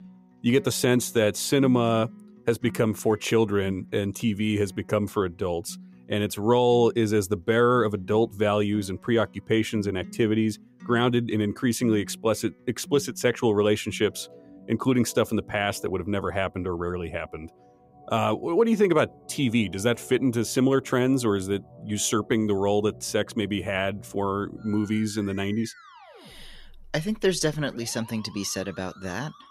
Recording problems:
background music; faint; throughout; 20 dB below the speech

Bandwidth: 15.5 kHz